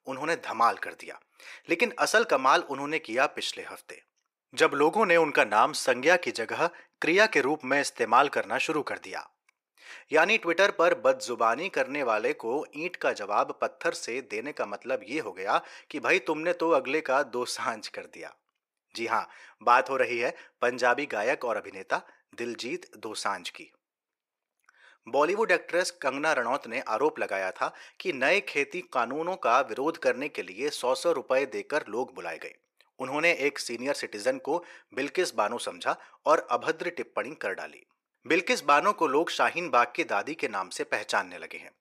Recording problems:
thin; very; fading below 600 Hz

